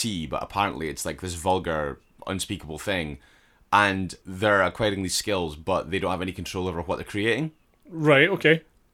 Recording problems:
abrupt cut into speech; at the start

